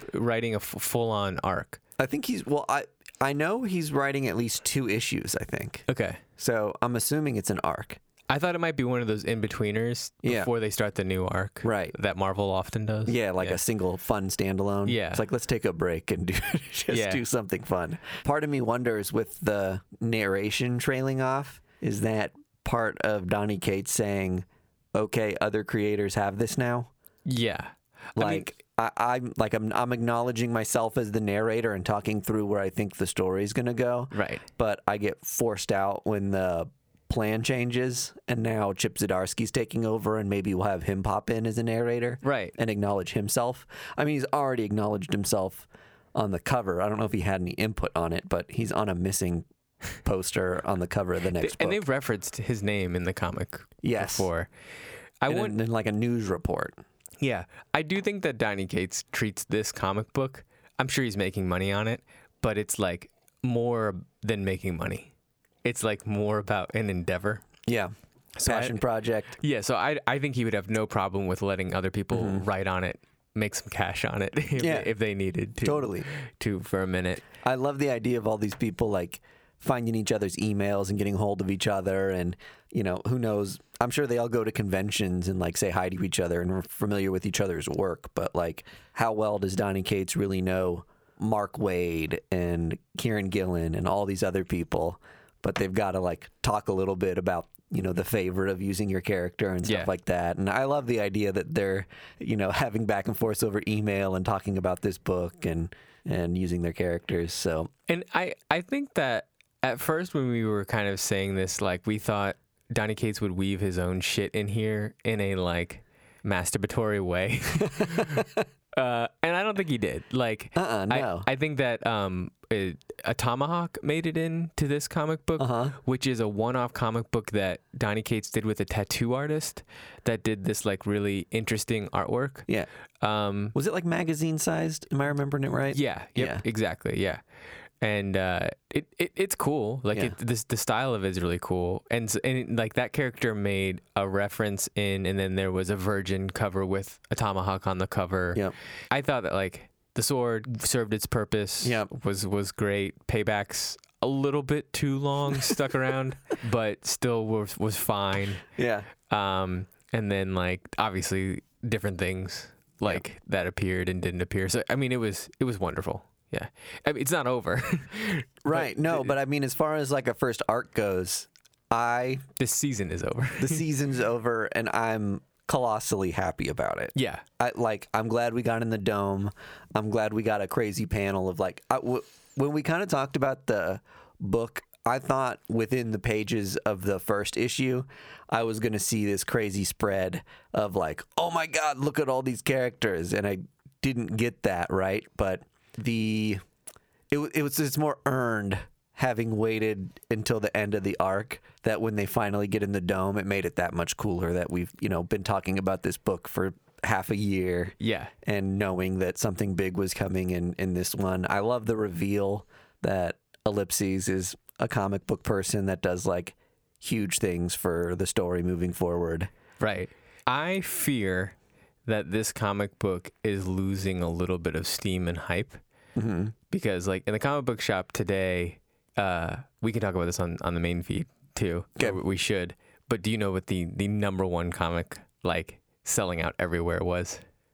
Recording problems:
squashed, flat; somewhat

